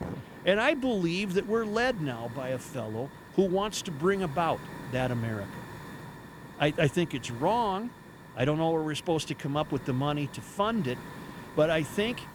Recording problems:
hiss; noticeable; throughout; 15 dB below the speech

